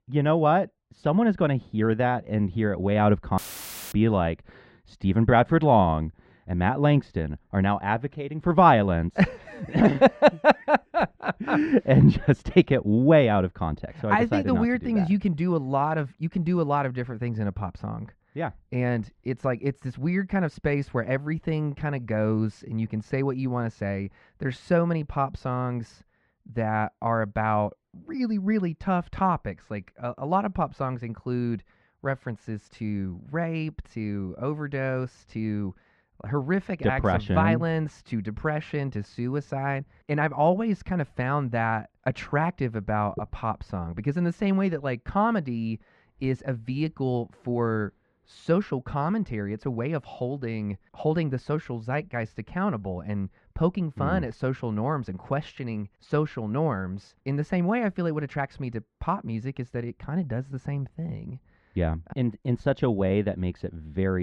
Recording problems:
muffled; very; fading above 1.5 kHz
audio cutting out; filled with static; at 3.5 s for 0.5 s
abrupt cut into speech; at the end

